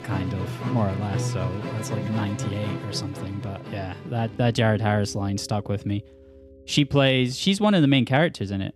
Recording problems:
background music; loud; throughout; 9 dB below the speech

